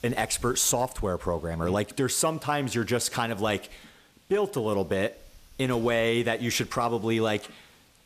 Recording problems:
hiss; faint; throughout; 25 dB below the speech

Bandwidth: 14.5 kHz